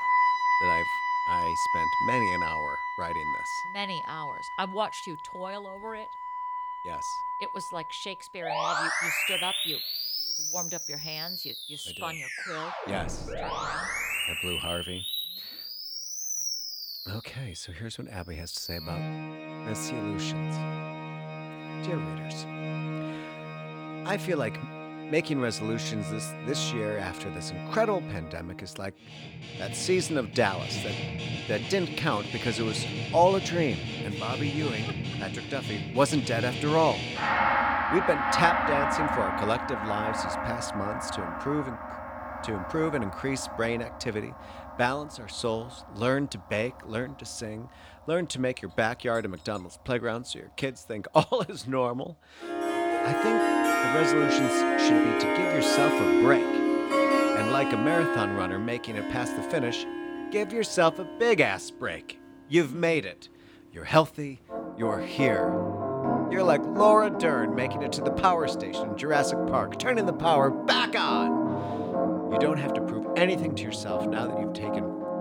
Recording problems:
background music; very loud; throughout; as loud as the speech

